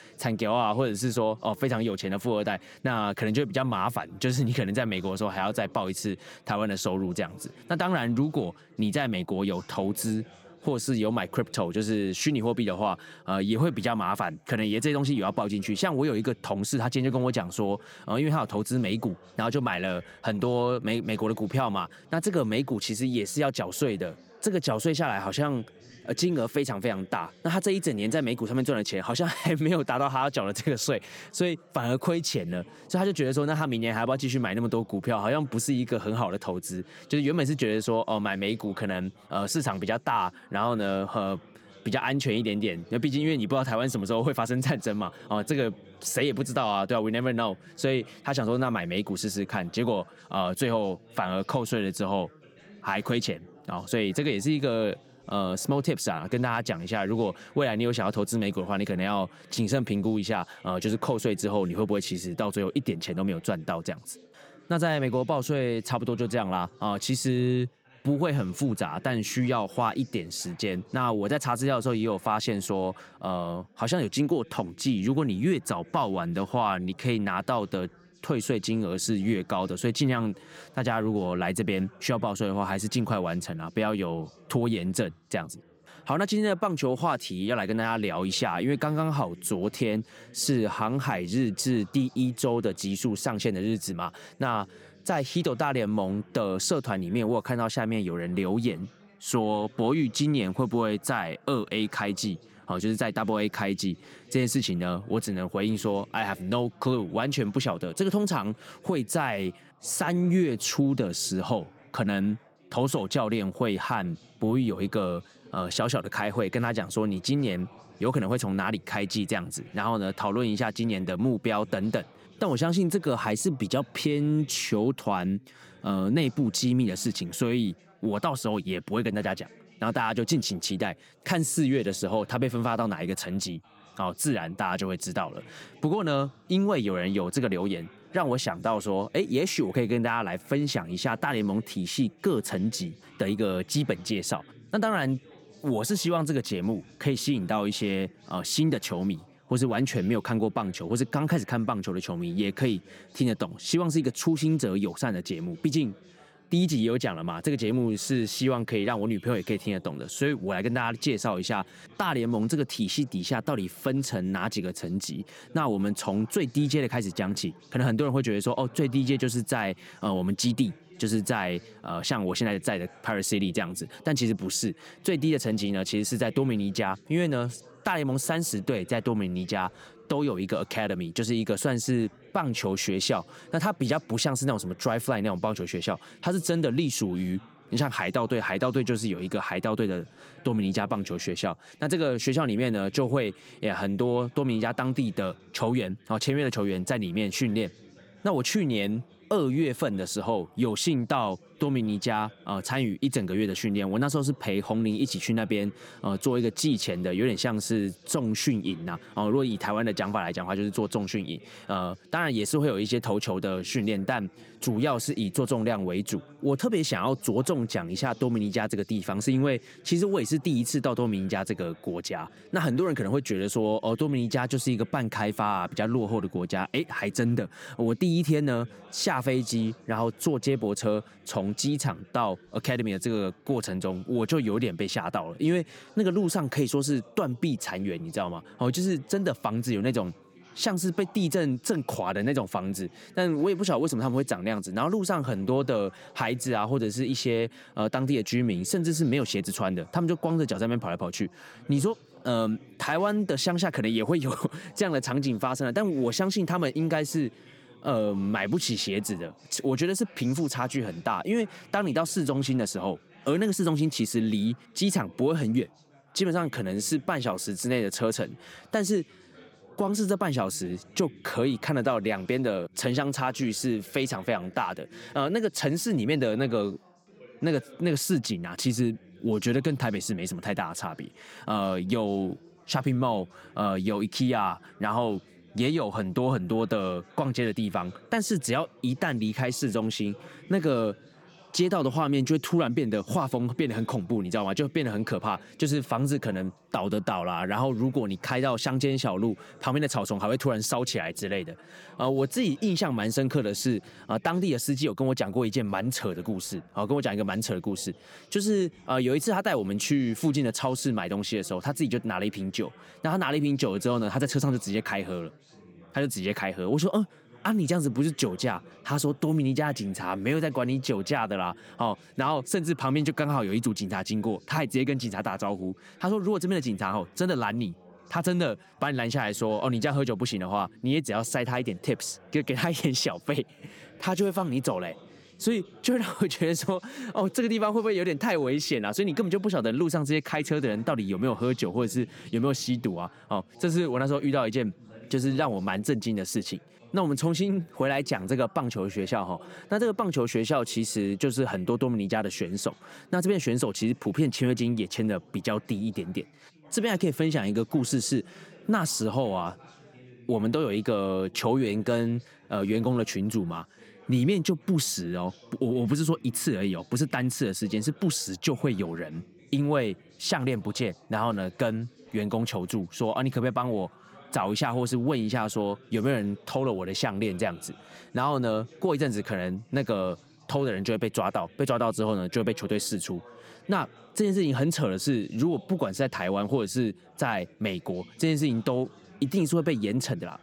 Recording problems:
background chatter; faint; throughout; 3 voices, 25 dB below the speech

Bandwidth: 18.5 kHz